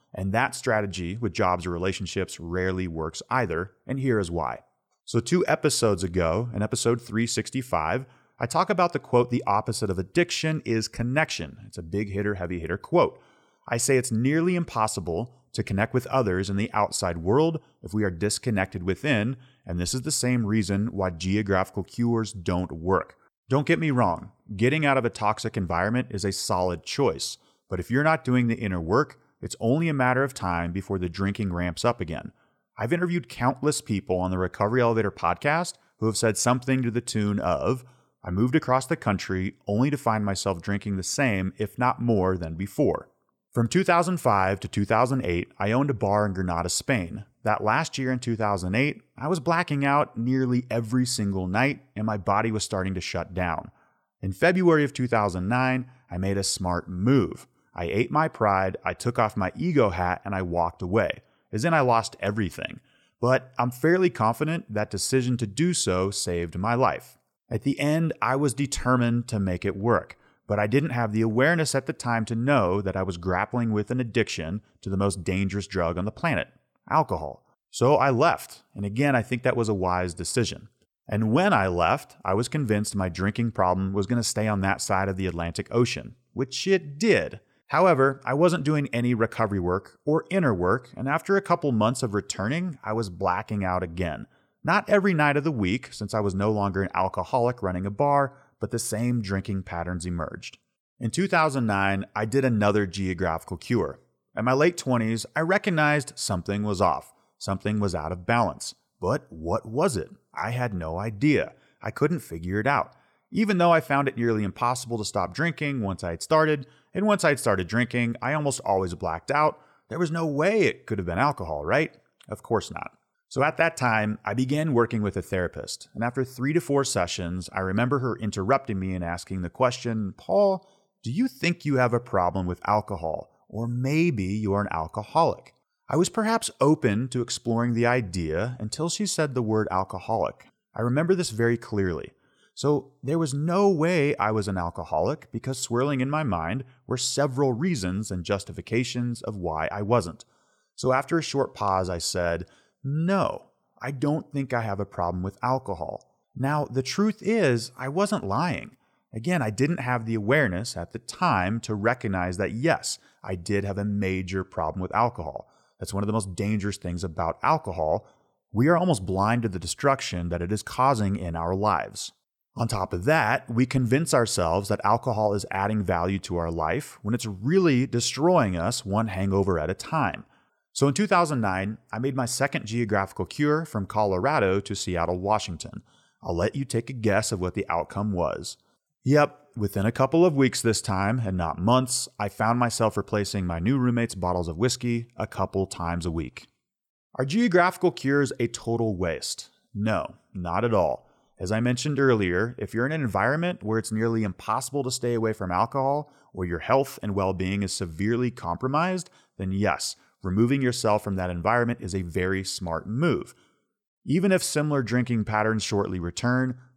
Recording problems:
none

